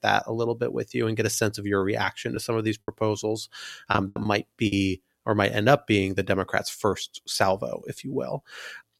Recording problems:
choppy; very; at 4 s; 12% of the speech affected

